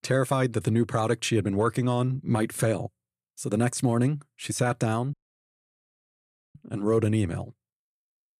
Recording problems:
audio cutting out; at 5 s for 1.5 s

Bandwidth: 14.5 kHz